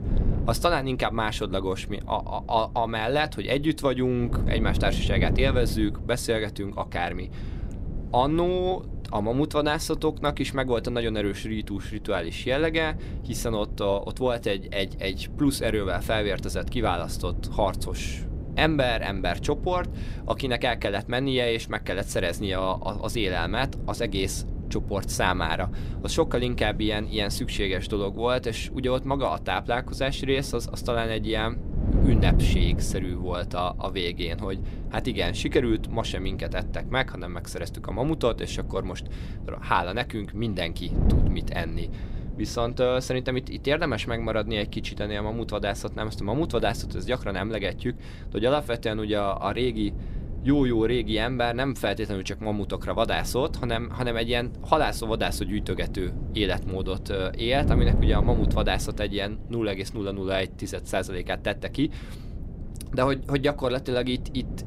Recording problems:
wind noise on the microphone; occasional gusts; 15 dB below the speech

